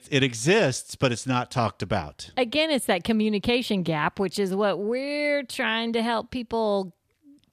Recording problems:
none

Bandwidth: 14.5 kHz